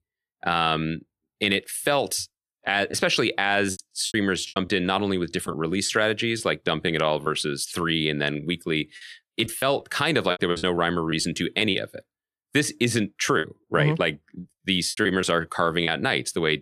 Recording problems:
choppy; very; 8% of the speech affected

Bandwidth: 14.5 kHz